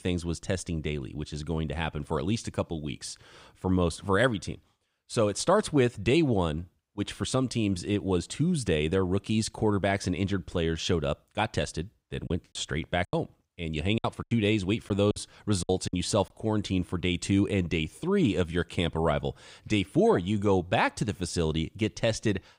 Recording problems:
choppy; very; from 12 to 16 s; 11% of the speech affected

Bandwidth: 15.5 kHz